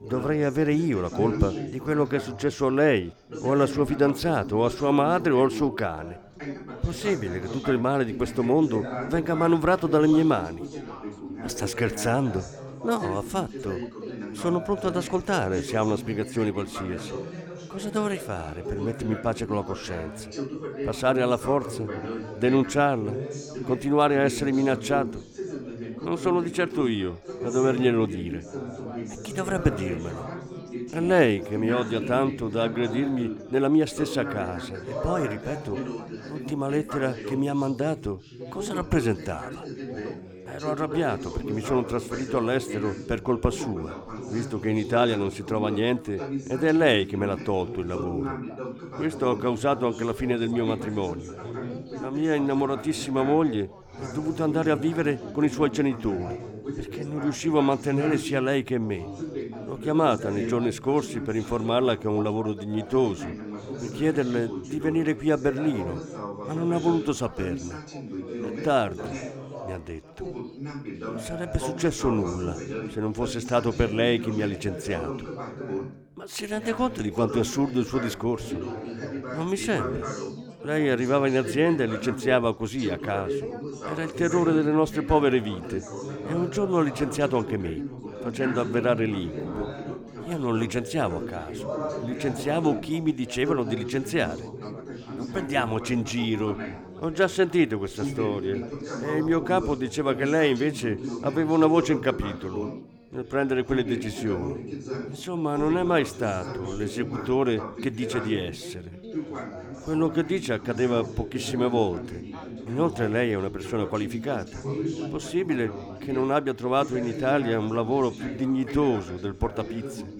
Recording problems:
background chatter; loud; throughout; 4 voices, 9 dB below the speech

